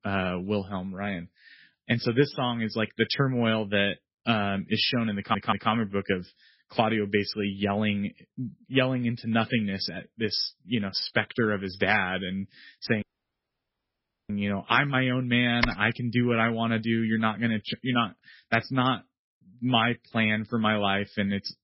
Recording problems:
garbled, watery; badly; nothing above 5.5 kHz
audio stuttering; at 5 s
audio cutting out; at 13 s for 1.5 s
keyboard typing; noticeable; at 16 s; peak 3 dB below the speech

